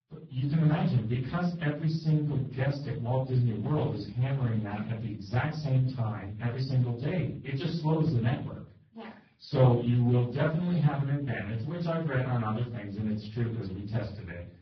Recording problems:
off-mic speech; far
garbled, watery; badly; nothing above 5.5 kHz
room echo; slight; dies away in 0.4 s

